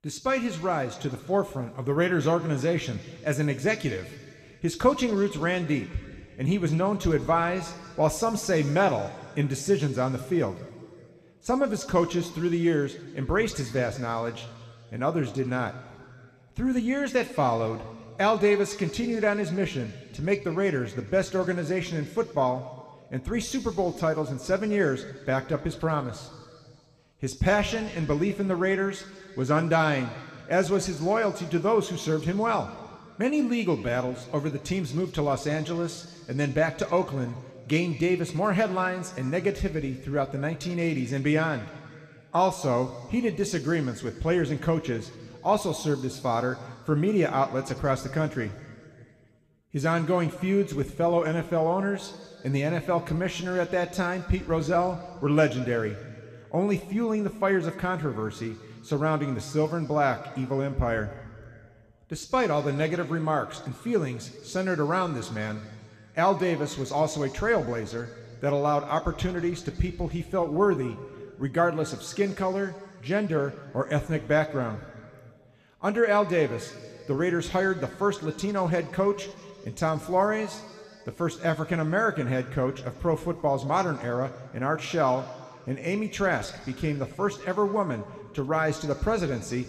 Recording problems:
room echo; very slight; dies away in 2.2 s

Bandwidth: 15 kHz